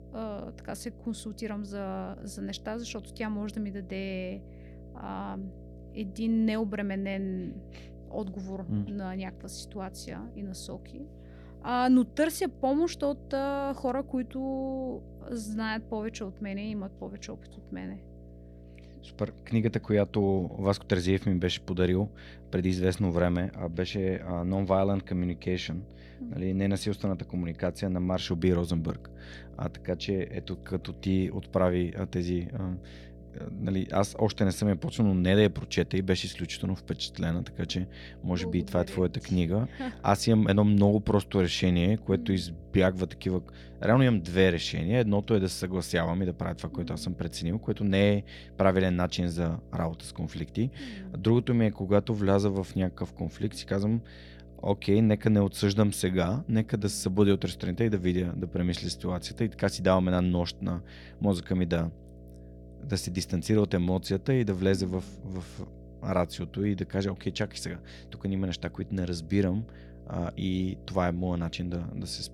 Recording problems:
electrical hum; faint; throughout; 60 Hz, 25 dB below the speech

